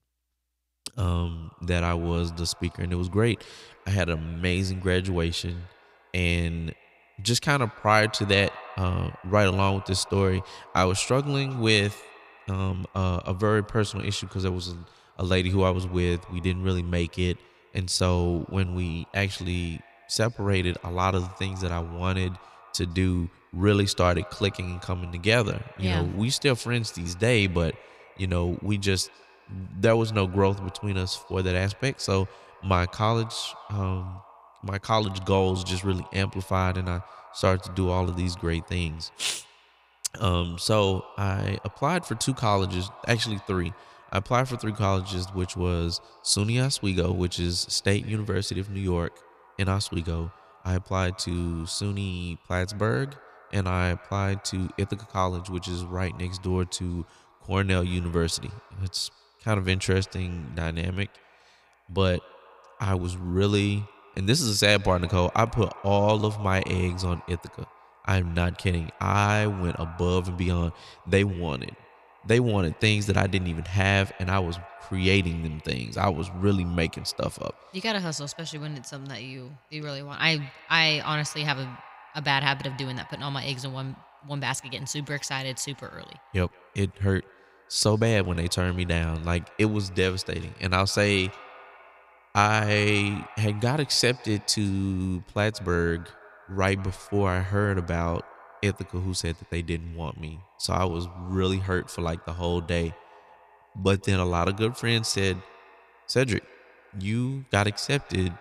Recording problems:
echo of what is said; faint; throughout; 160 ms later, 20 dB below the speech

